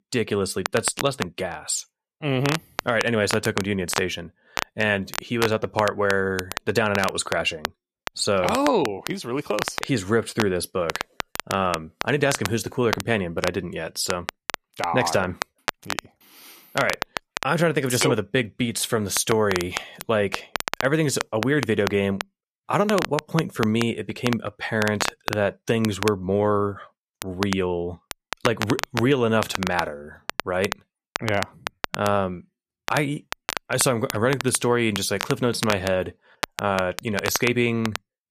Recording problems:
crackle, like an old record; loud; 8 dB below the speech

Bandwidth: 14.5 kHz